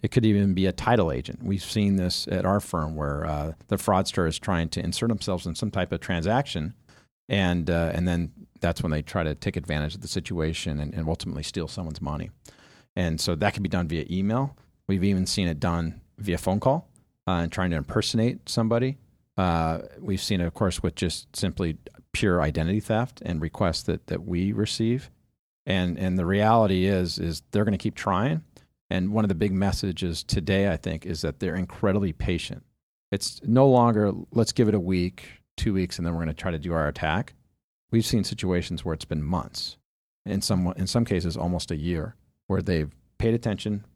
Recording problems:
none

